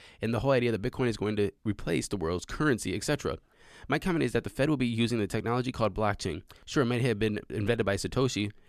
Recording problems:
none

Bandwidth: 14.5 kHz